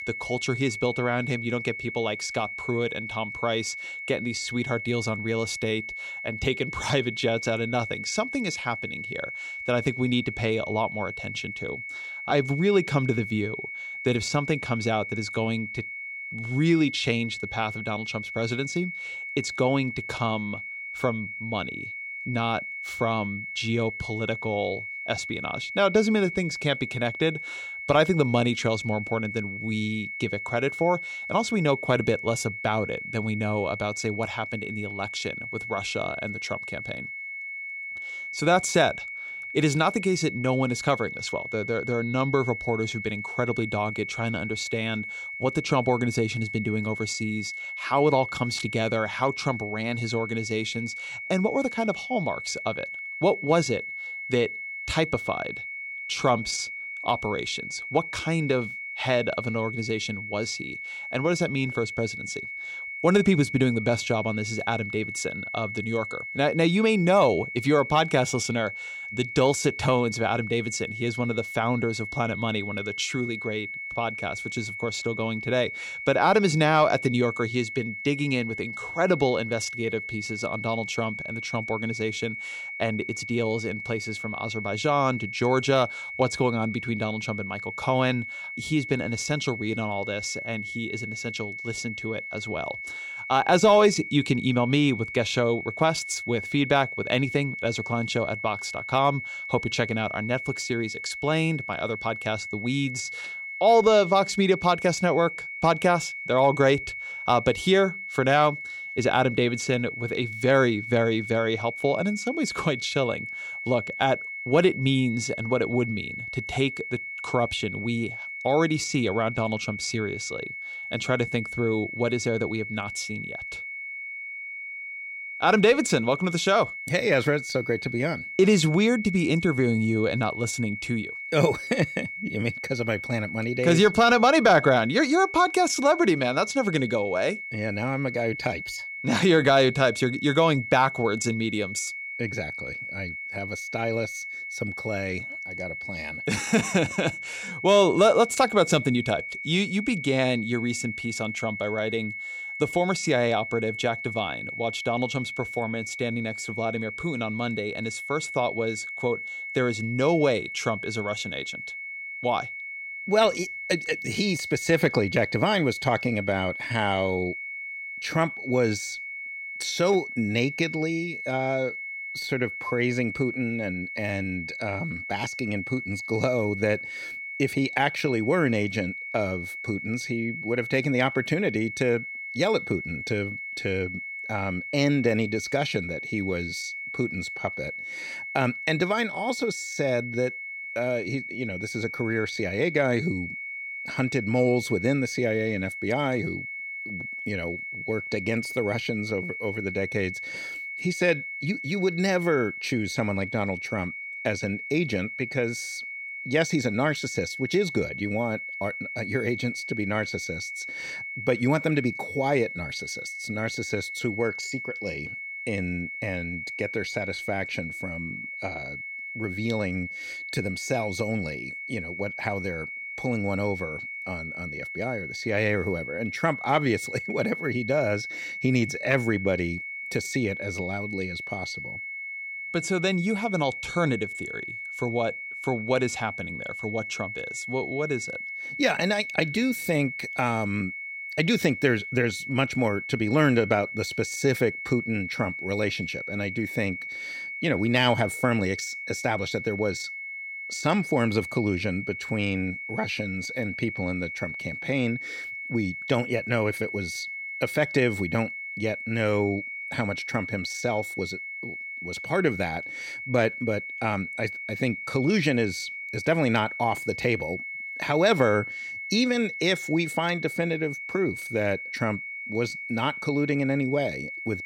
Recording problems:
high-pitched whine; loud; throughout; 2 kHz, 7 dB below the speech

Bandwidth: 16 kHz